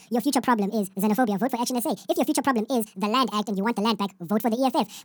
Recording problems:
wrong speed and pitch; too fast and too high; 1.7 times normal speed

